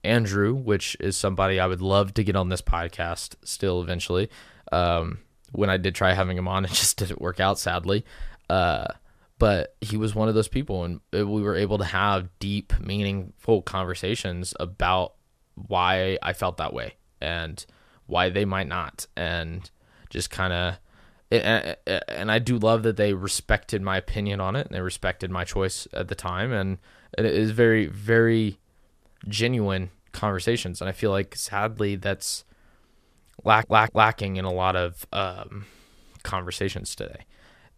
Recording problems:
audio stuttering; at 33 s

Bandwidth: 14.5 kHz